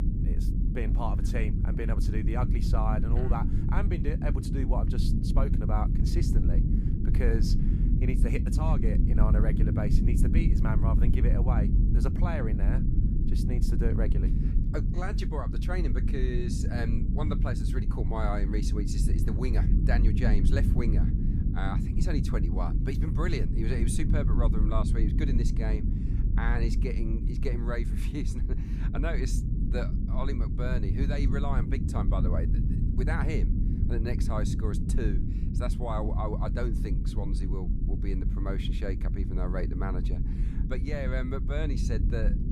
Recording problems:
low rumble; loud; throughout; 3 dB below the speech

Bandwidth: 15 kHz